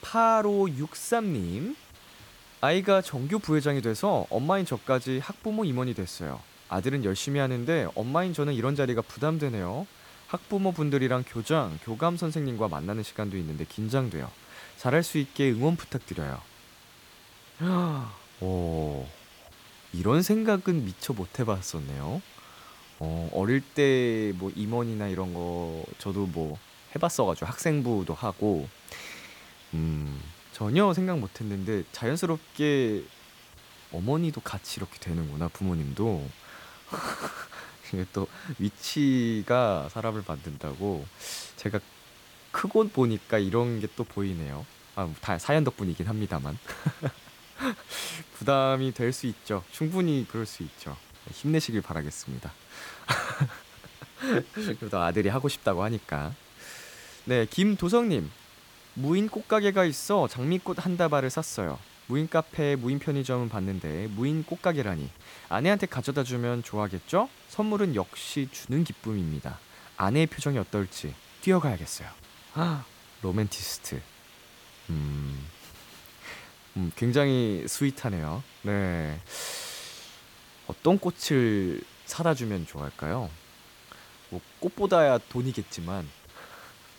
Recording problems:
hiss; faint; throughout; 20 dB below the speech

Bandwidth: 18 kHz